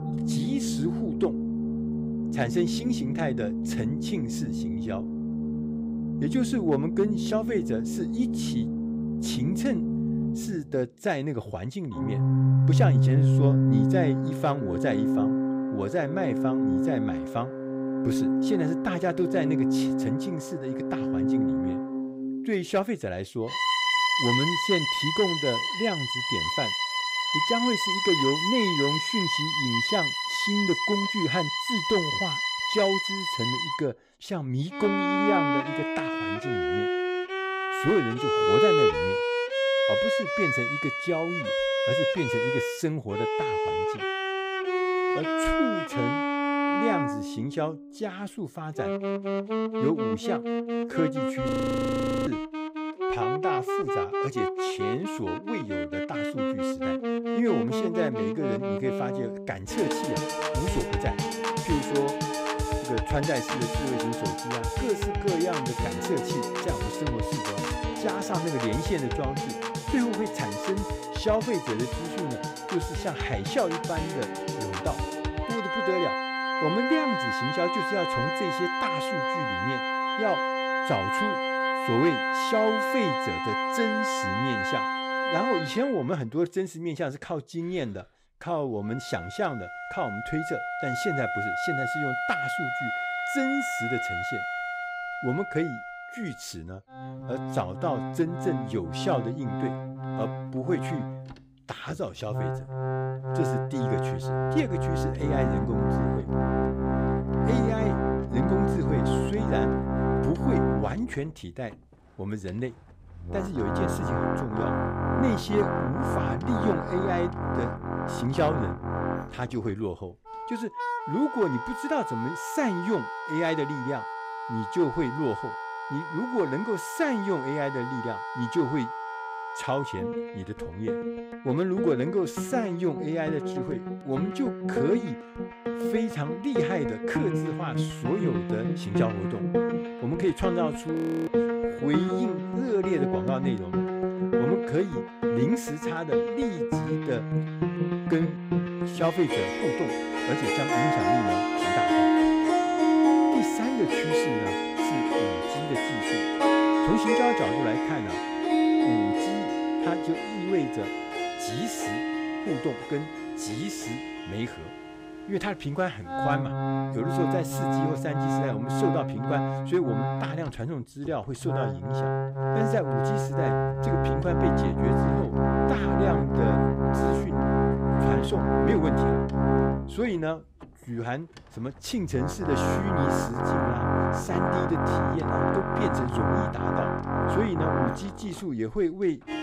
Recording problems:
background music; very loud; throughout; 3 dB above the speech
audio freezing; at 51 s for 1 s and at 2:21

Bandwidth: 15.5 kHz